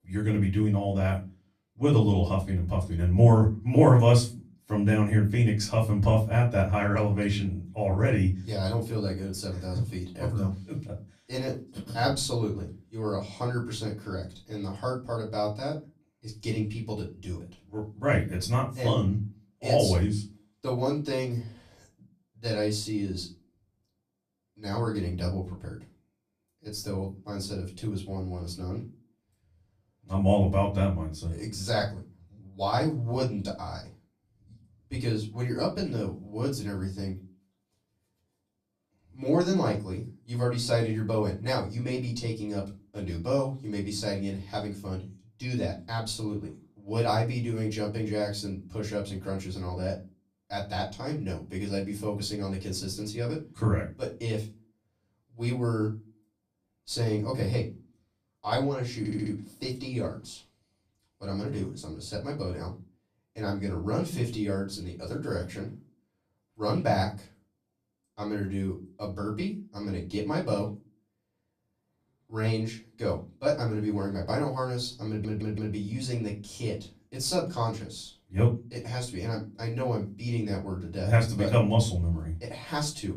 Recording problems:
off-mic speech; far
room echo; very slight; dies away in 0.3 s
audio stuttering; at 59 s and at 1:15

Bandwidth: 15 kHz